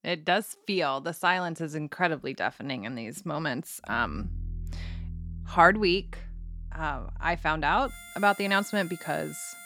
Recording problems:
background music; noticeable; from 4 s on; 15 dB below the speech

